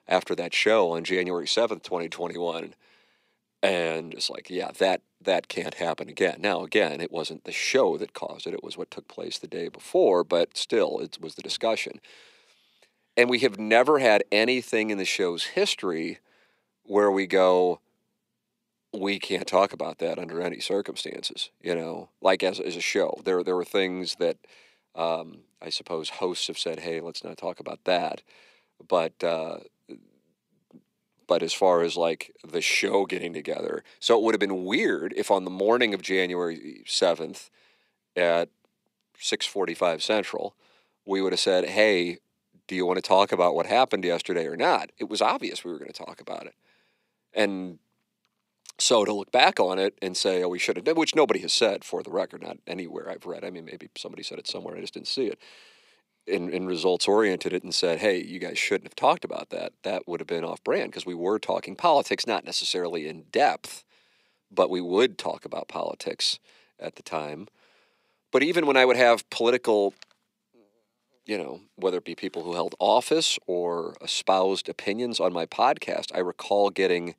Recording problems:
thin; somewhat; fading below 450 Hz

